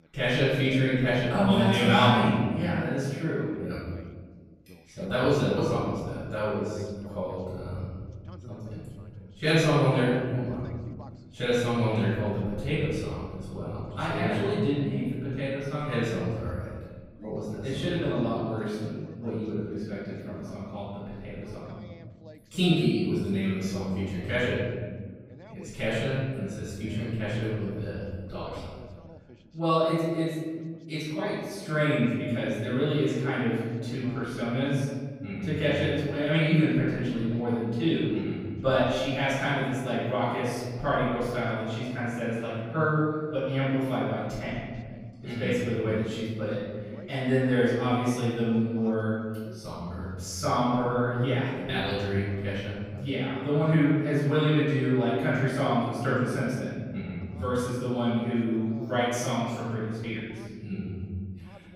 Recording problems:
room echo; strong; dies away in 1.8 s
off-mic speech; far
voice in the background; faint; throughout; 25 dB below the speech

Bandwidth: 15.5 kHz